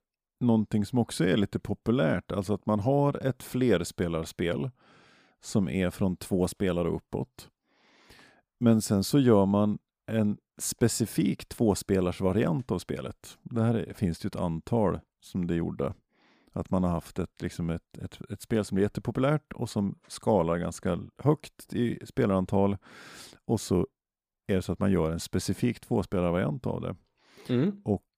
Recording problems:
none

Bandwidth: 15 kHz